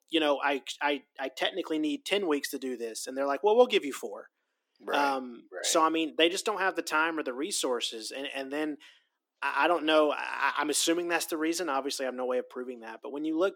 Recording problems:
thin; somewhat; fading below 250 Hz

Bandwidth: 17.5 kHz